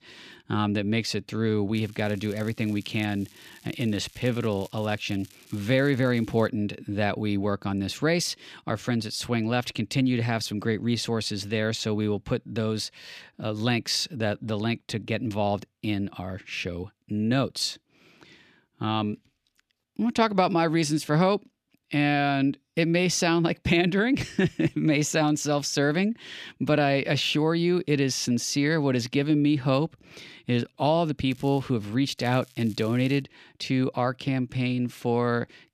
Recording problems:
crackling; faint; from 2 to 6.5 s, at 31 s and from 32 to 33 s; 25 dB below the speech

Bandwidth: 14.5 kHz